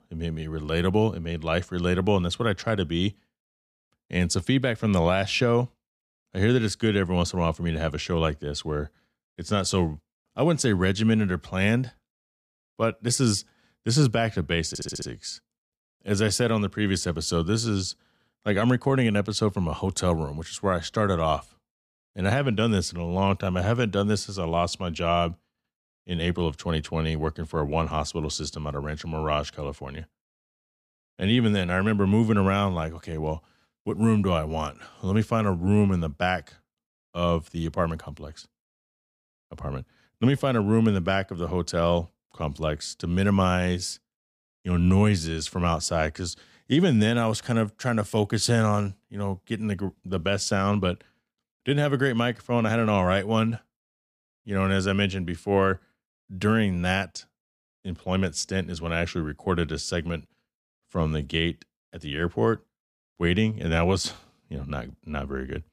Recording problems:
audio stuttering; at 15 s

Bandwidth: 14.5 kHz